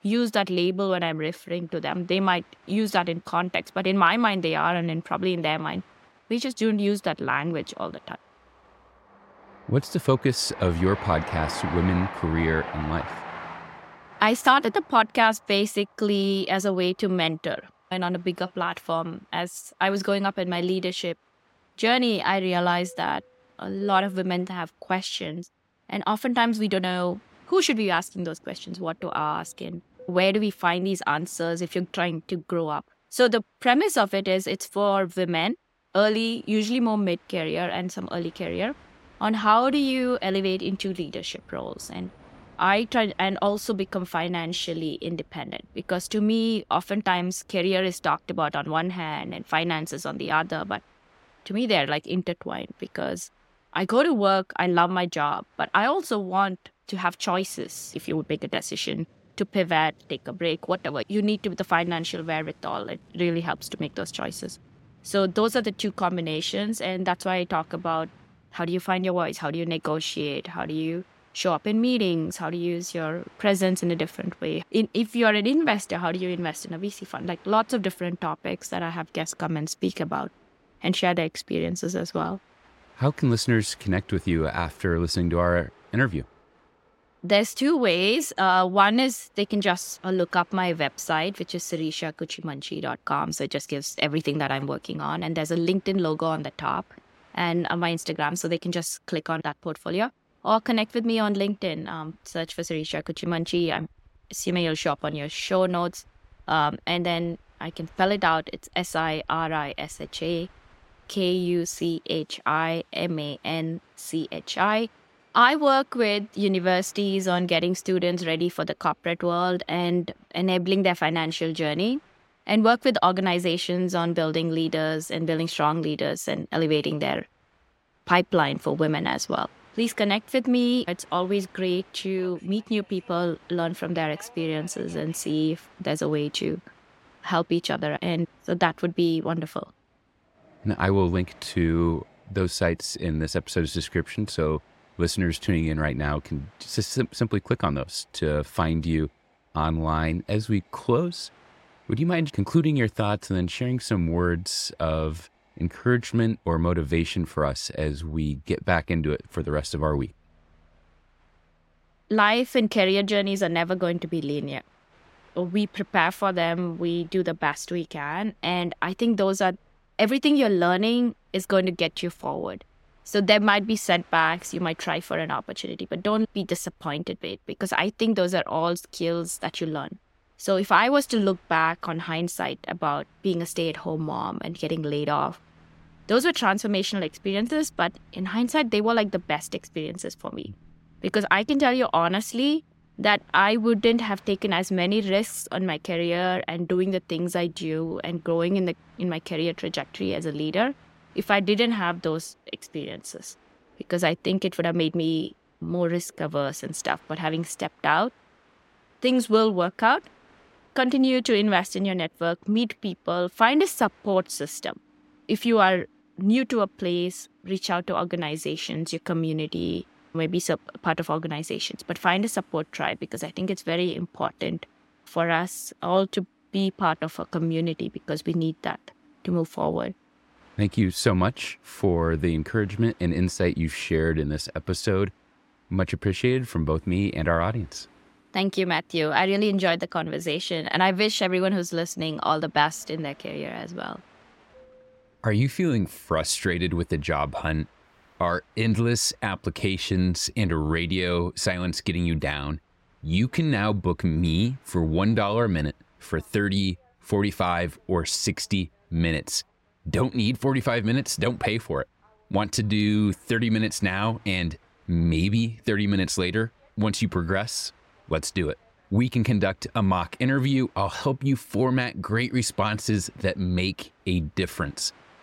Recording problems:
train or aircraft noise; faint; throughout; 25 dB below the speech

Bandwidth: 16 kHz